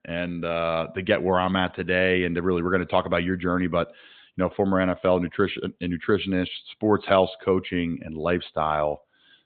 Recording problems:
high frequencies cut off; severe; nothing above 4 kHz

